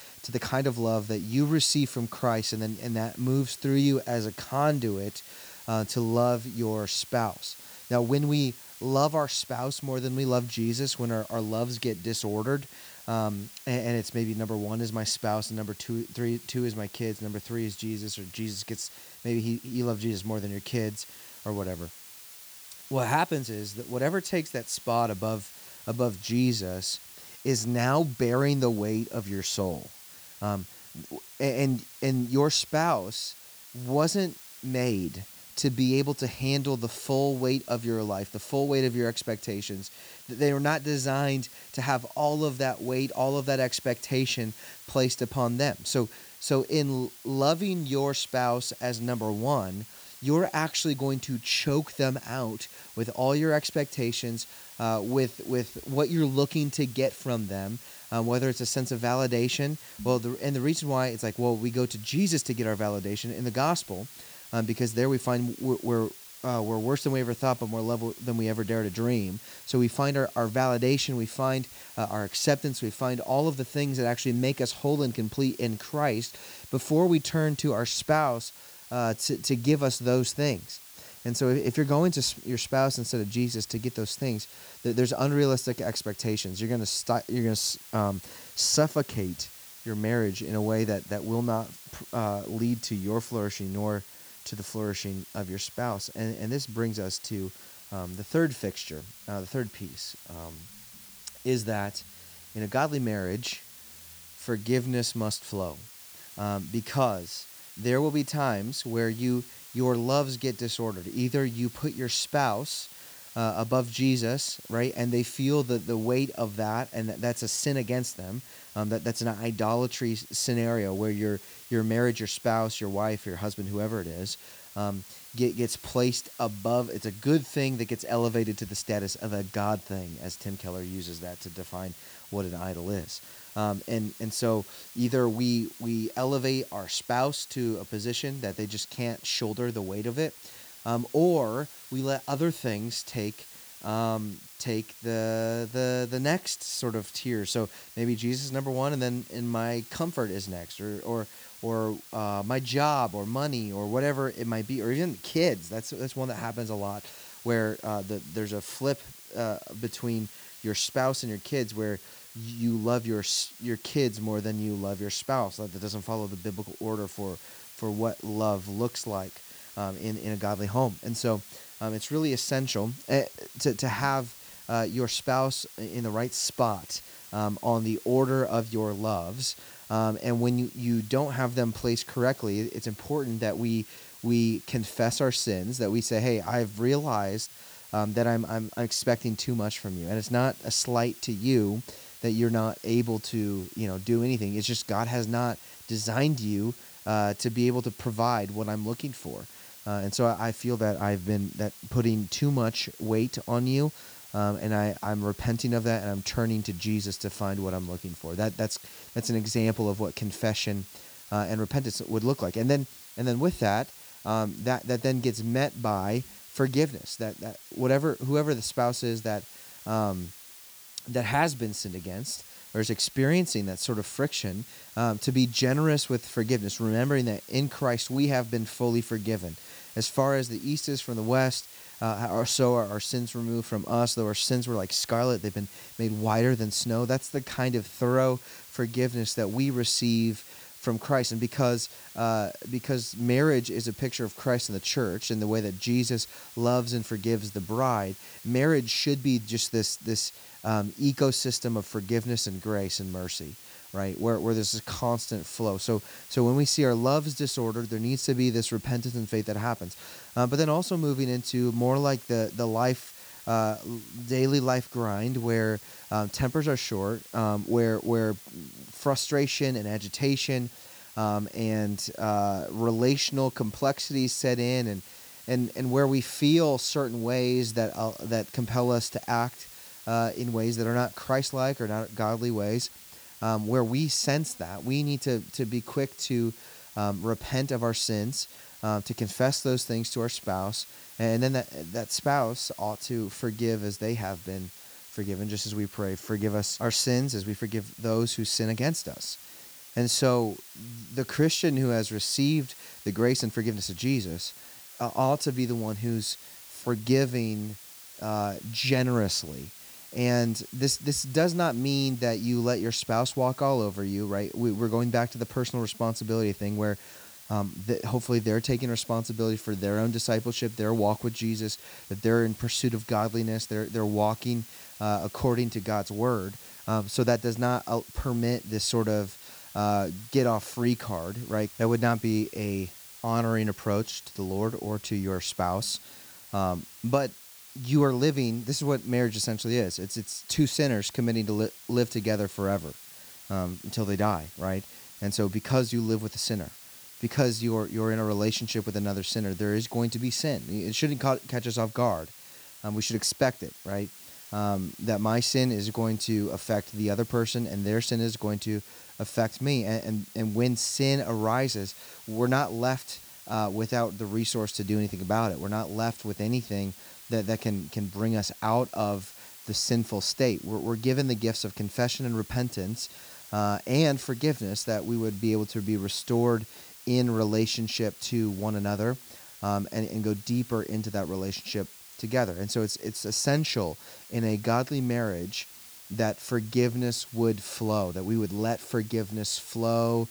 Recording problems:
hiss; noticeable; throughout; 15 dB below the speech

